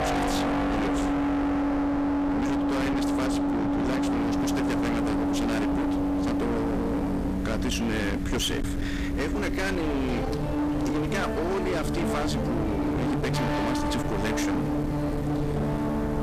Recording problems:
distortion; heavy; 54% of the sound clipped
background music; very loud; throughout; 2 dB above the speech
traffic noise; noticeable; throughout; 15 dB below the speech
hiss; noticeable; from 4 s on; 15 dB below the speech
low rumble; noticeable; throughout; 10 dB below the speech

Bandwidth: 14.5 kHz